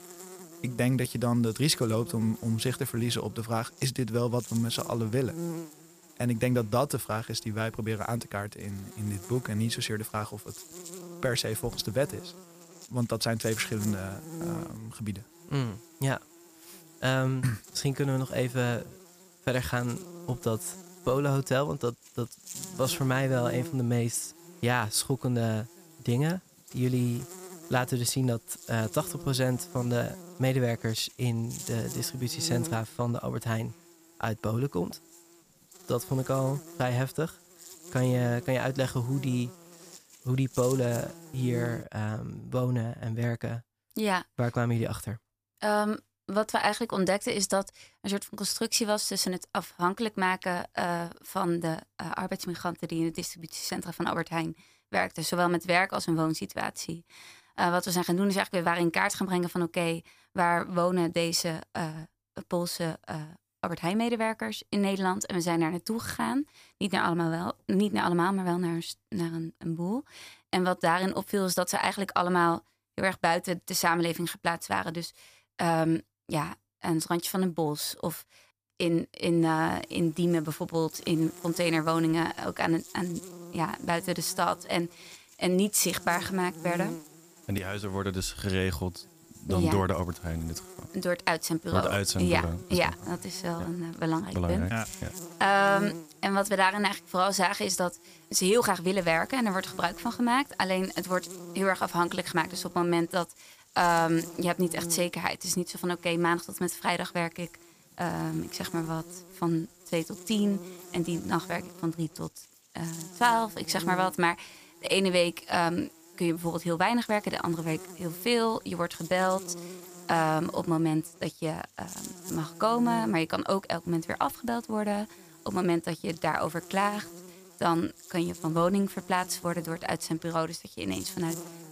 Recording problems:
electrical hum; noticeable; until 42 s and from 1:19 on; 50 Hz, 20 dB below the speech

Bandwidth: 15 kHz